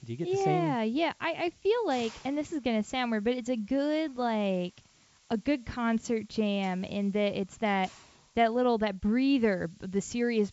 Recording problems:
high frequencies cut off; noticeable; nothing above 8 kHz
hiss; faint; throughout; 25 dB below the speech

